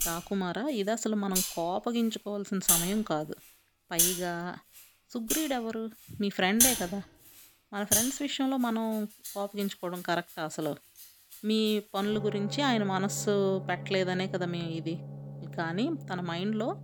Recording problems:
background music; very loud; throughout; 1 dB above the speech

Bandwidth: 18.5 kHz